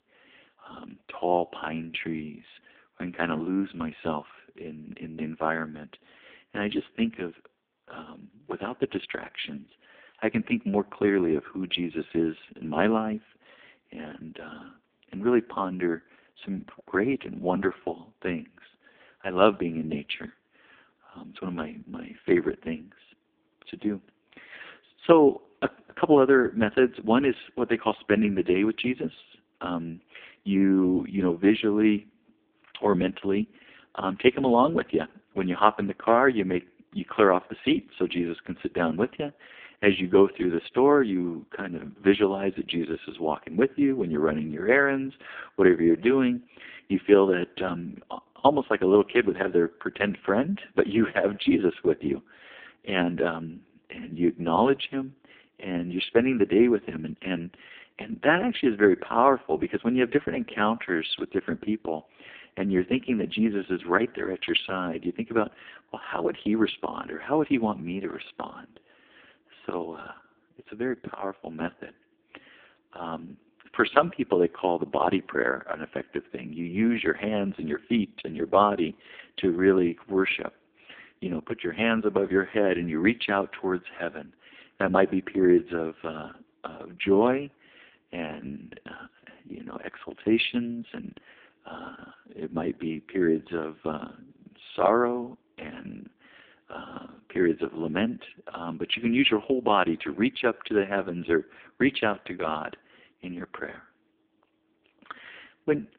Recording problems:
phone-call audio; poor line

